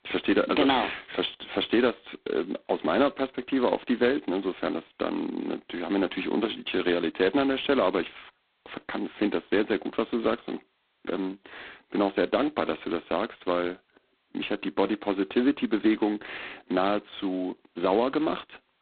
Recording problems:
phone-call audio; poor line; nothing above 4 kHz

